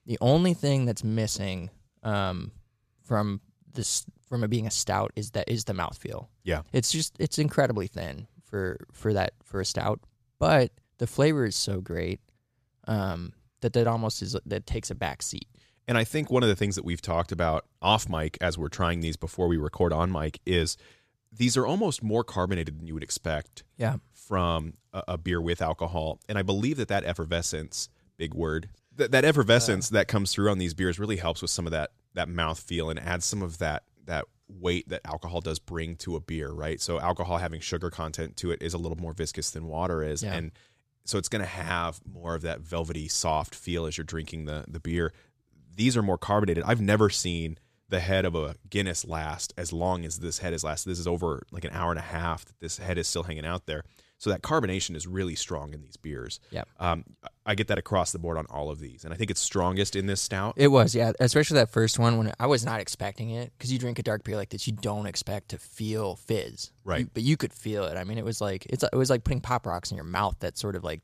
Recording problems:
none

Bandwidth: 14.5 kHz